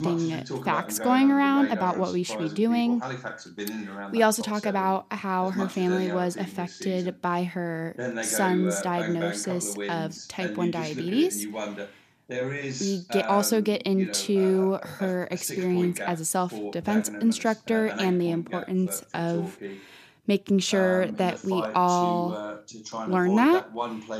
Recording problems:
voice in the background; loud; throughout; 9 dB below the speech

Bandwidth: 14.5 kHz